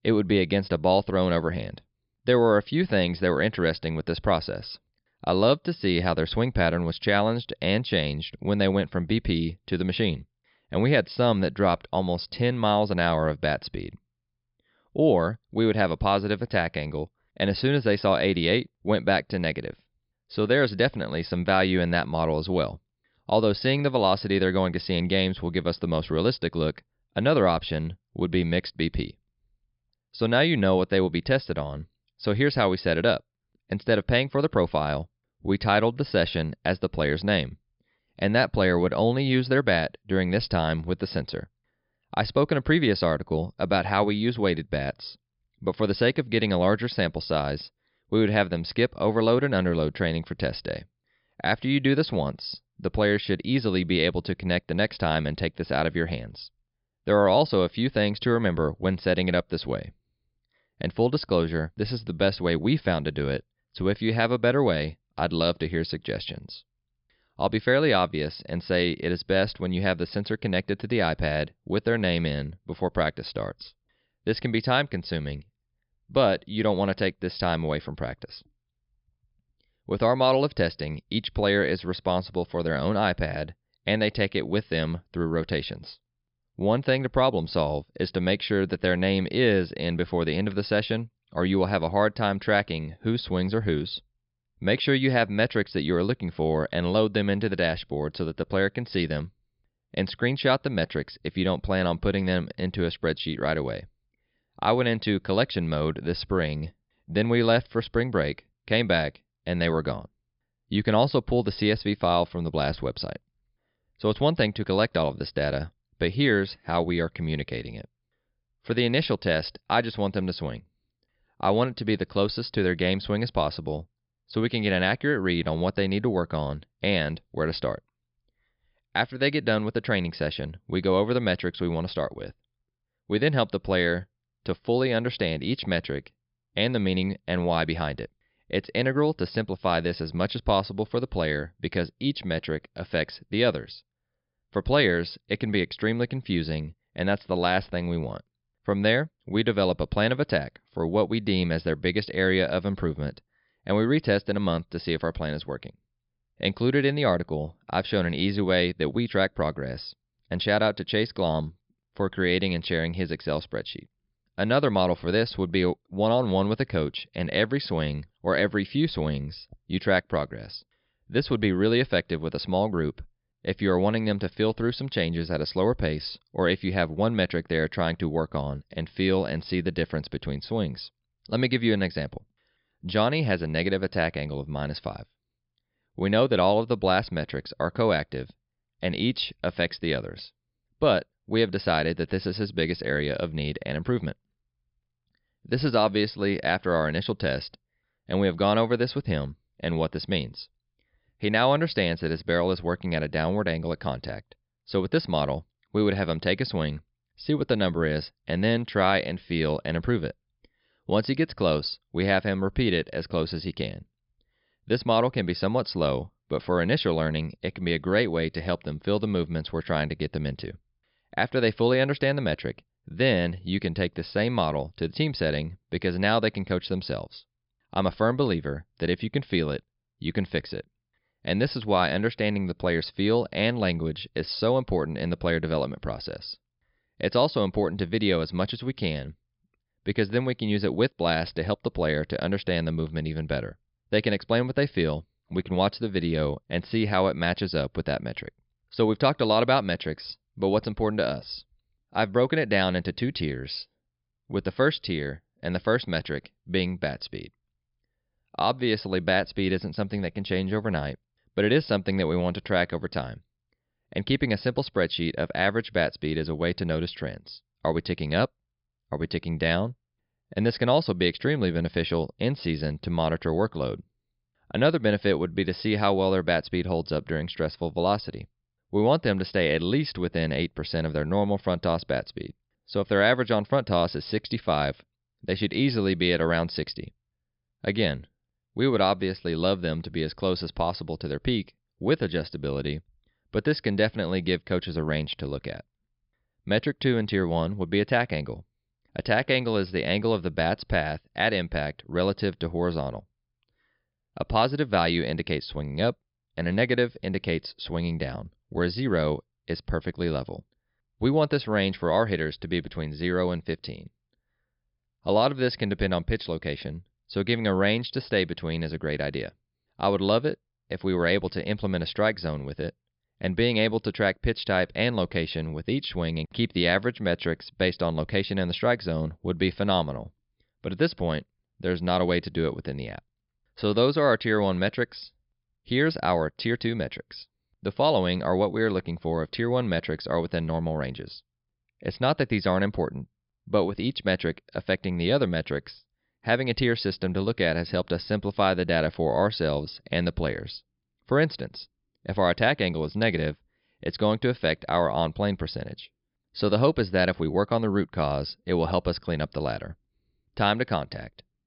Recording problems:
high frequencies cut off; noticeable; nothing above 5.5 kHz

